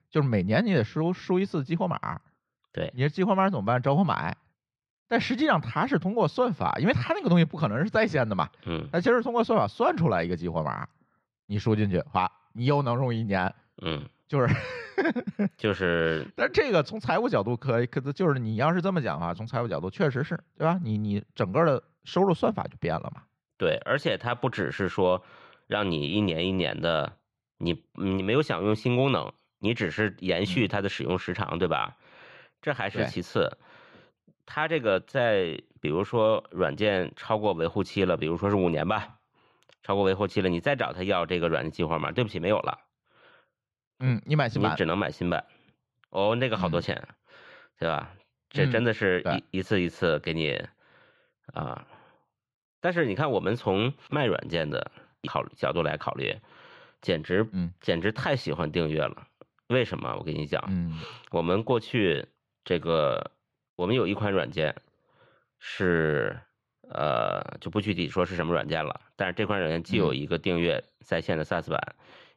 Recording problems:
muffled; very slightly; fading above 4 kHz

